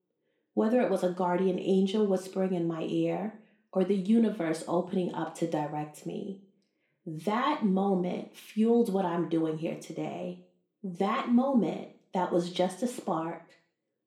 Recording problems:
room echo; slight; dies away in 0.4 s
off-mic speech; somewhat distant

